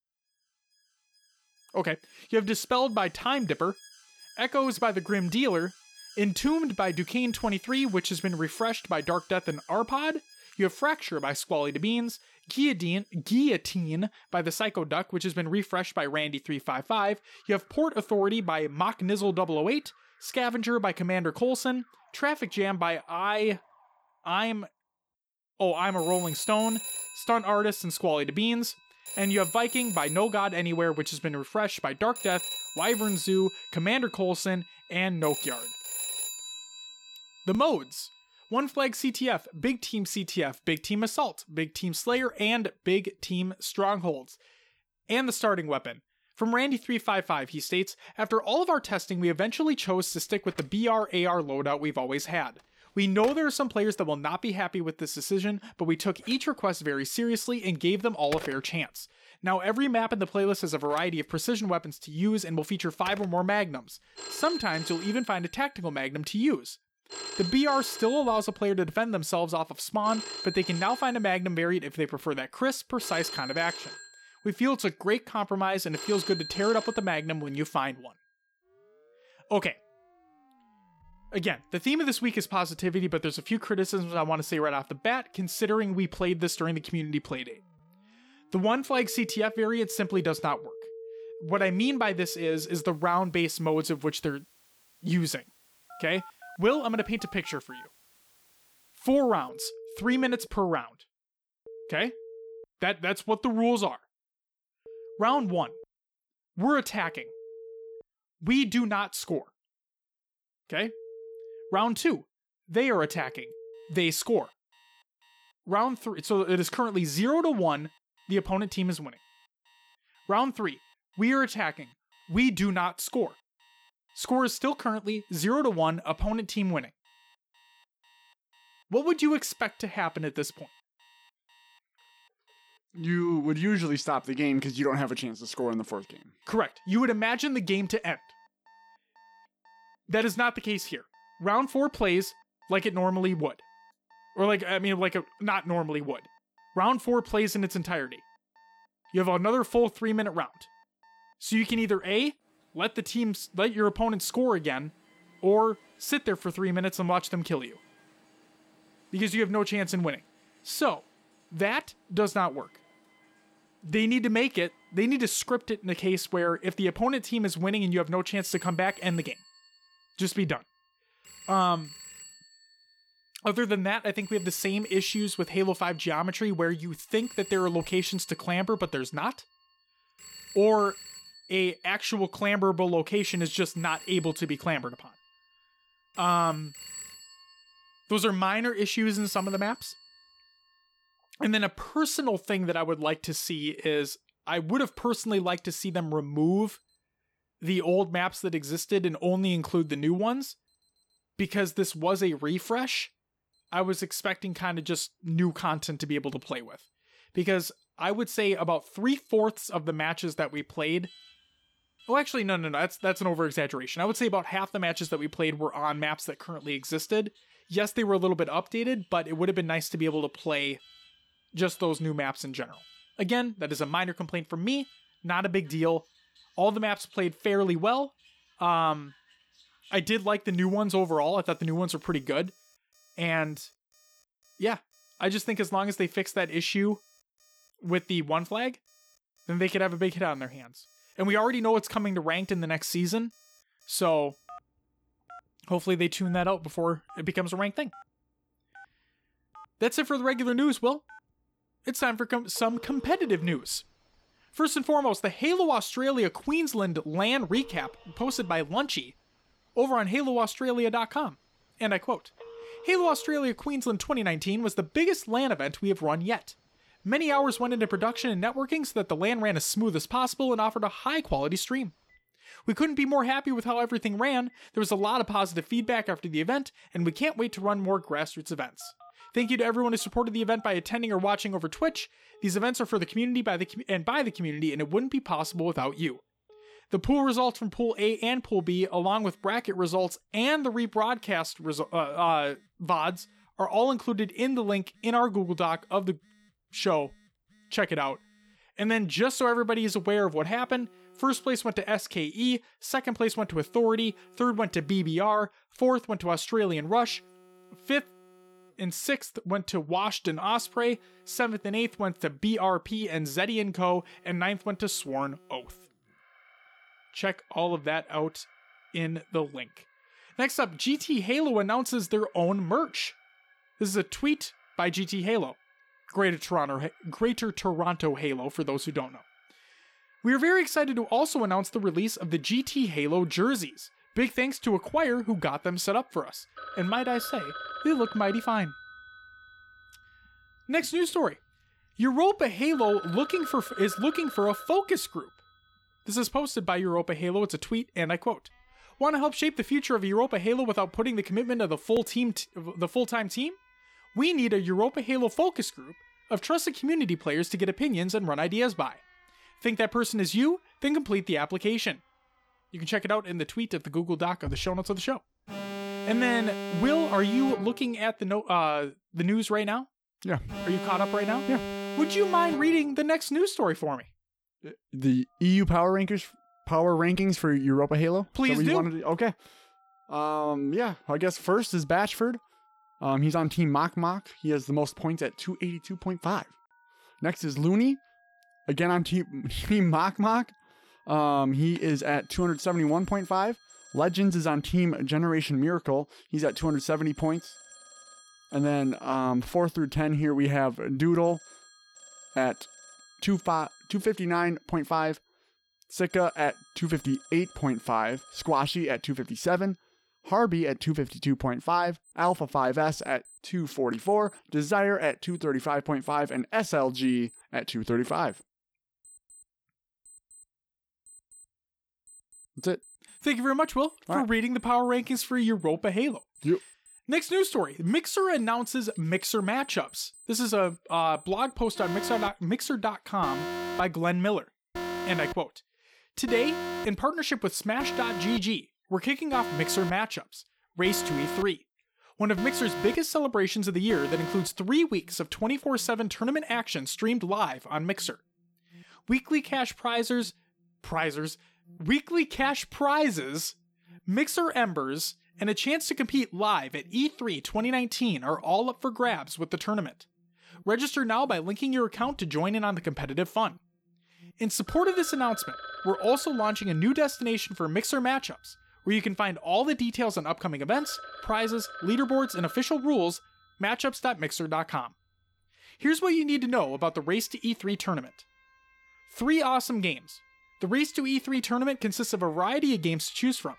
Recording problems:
alarms or sirens; noticeable; throughout; 15 dB below the speech

